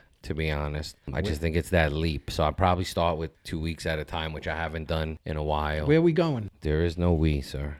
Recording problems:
none

